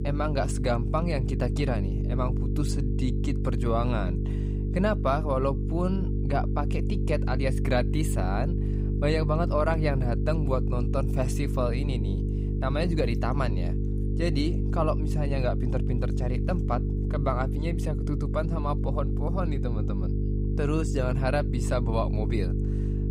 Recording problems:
electrical hum; loud; throughout; 50 Hz, 8 dB below the speech

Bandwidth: 15.5 kHz